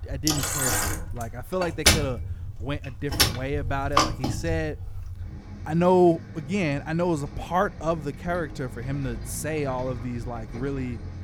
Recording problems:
traffic noise; very loud; throughout; as loud as the speech

